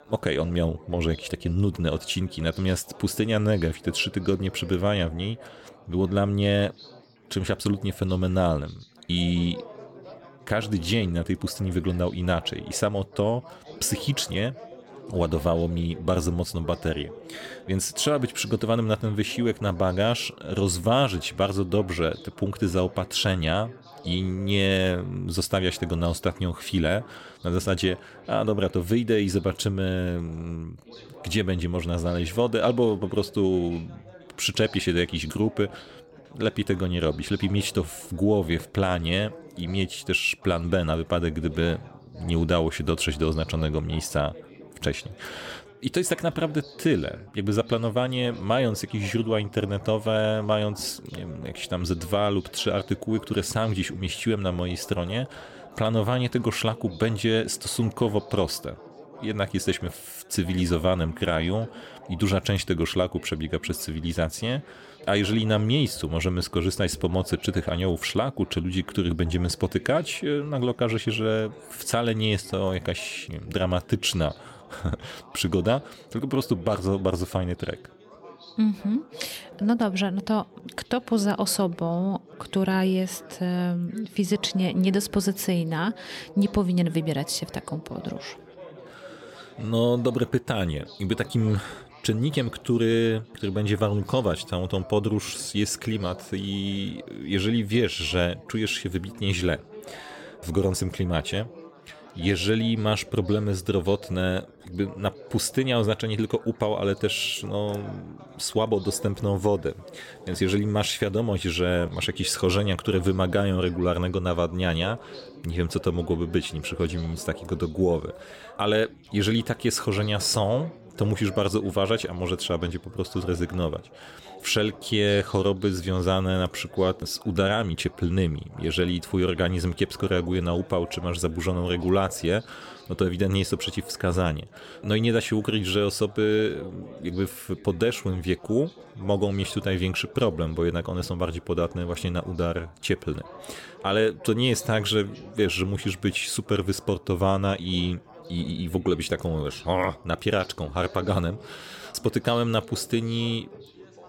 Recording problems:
chatter from many people; faint; throughout; 20 dB below the speech

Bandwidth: 16.5 kHz